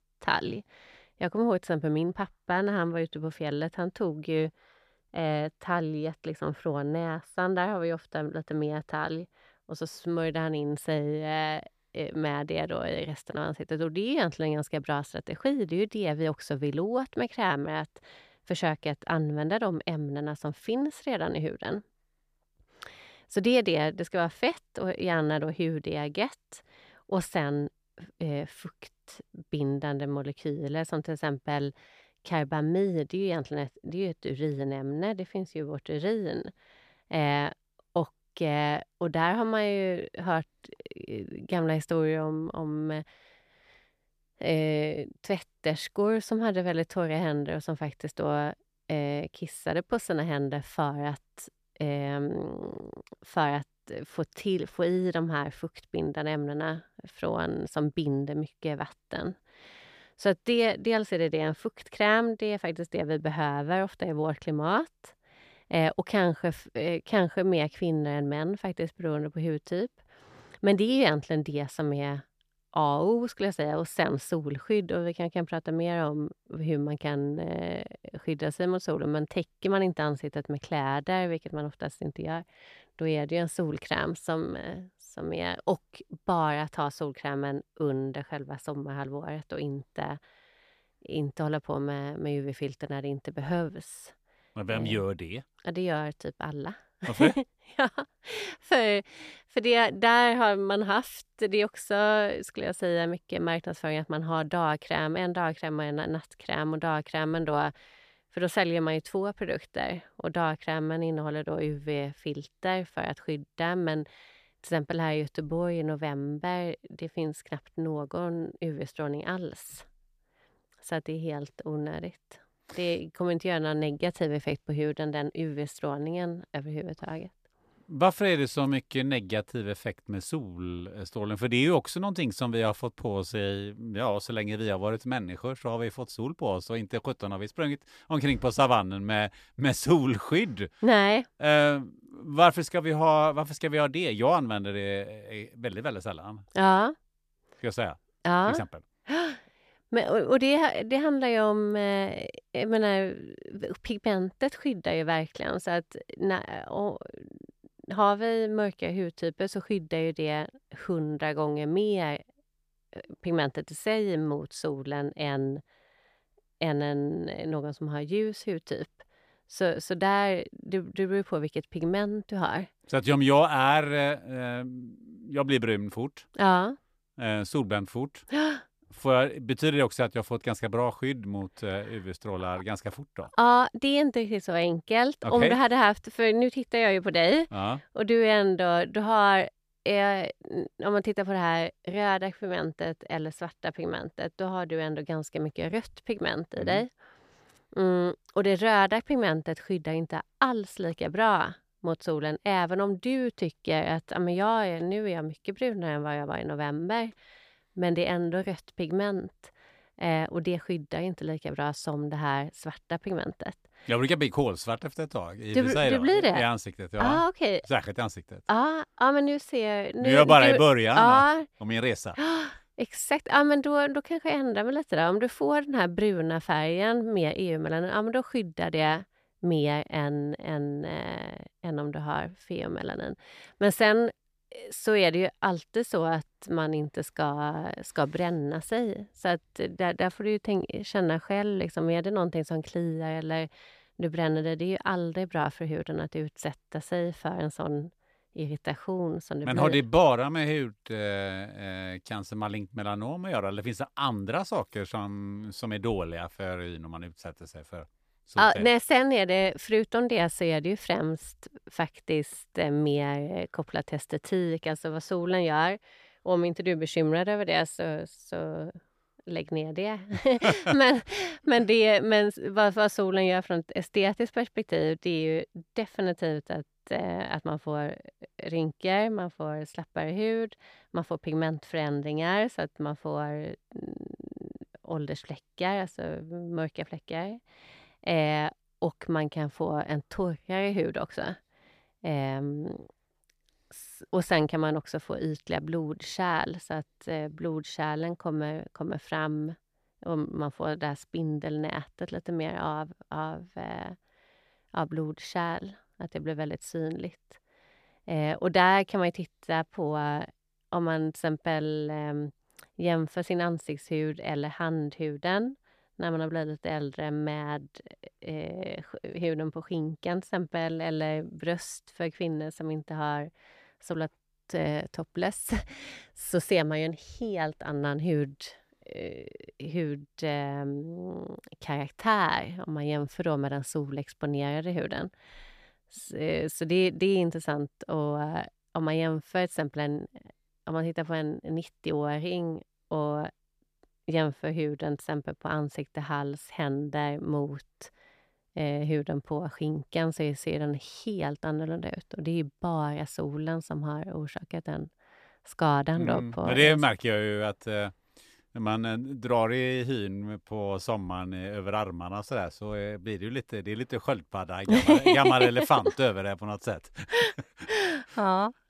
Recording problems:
none

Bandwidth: 14.5 kHz